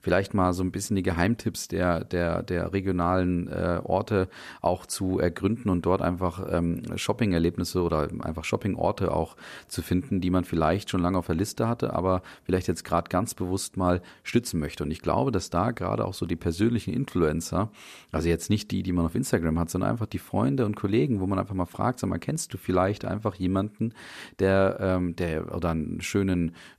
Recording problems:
none

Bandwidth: 14.5 kHz